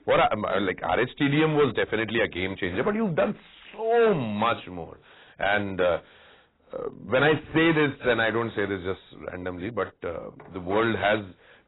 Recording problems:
distortion; heavy; 6% of the sound clipped
garbled, watery; badly; nothing above 4 kHz

